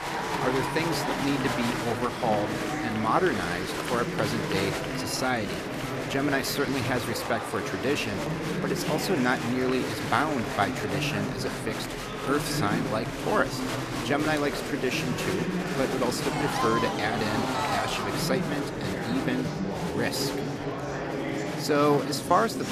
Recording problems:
murmuring crowd; loud; throughout; 1 dB below the speech

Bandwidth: 14.5 kHz